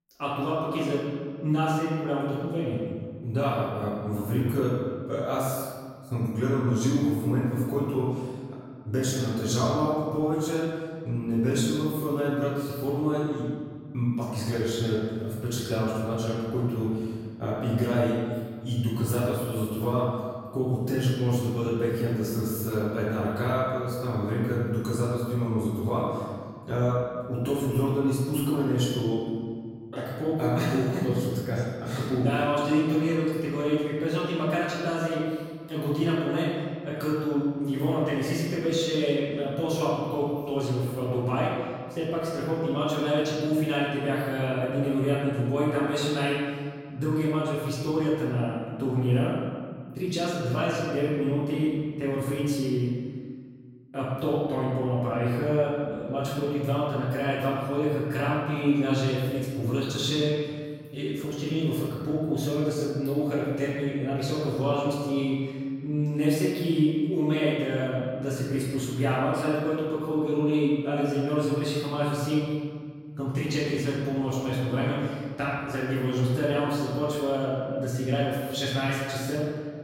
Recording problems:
room echo; strong; dies away in 1.7 s
off-mic speech; far

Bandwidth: 16 kHz